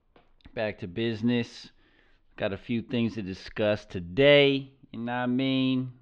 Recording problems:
muffled; slightly; fading above 3.5 kHz

